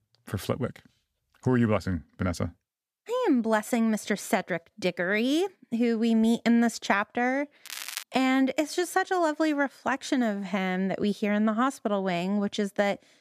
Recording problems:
crackling; loud; at 7.5 s, mostly in the pauses; 9 dB below the speech

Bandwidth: 14.5 kHz